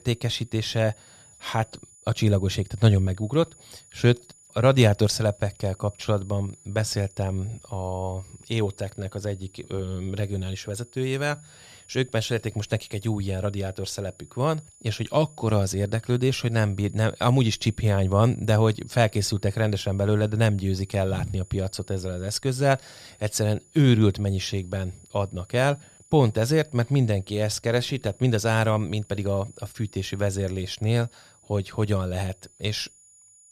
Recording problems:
high-pitched whine; faint; throughout; 7 kHz, 25 dB below the speech

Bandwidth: 14.5 kHz